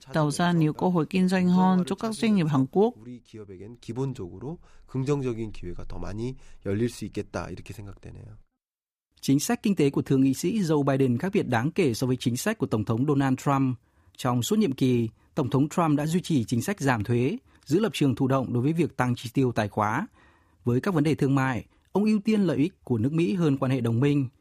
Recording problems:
none

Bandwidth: 15 kHz